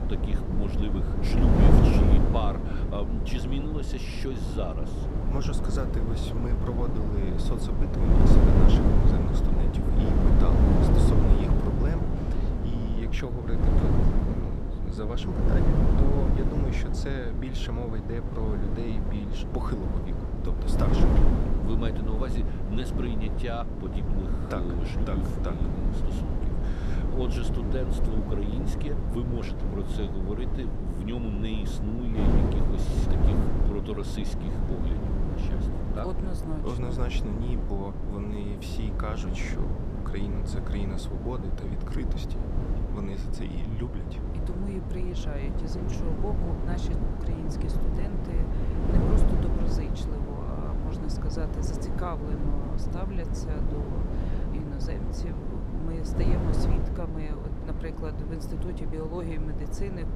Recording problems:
wind noise on the microphone; heavy; 3 dB above the speech

